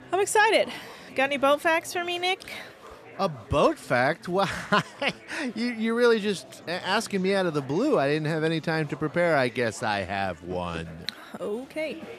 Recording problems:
chatter from many people; faint; throughout; 20 dB below the speech

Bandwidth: 14 kHz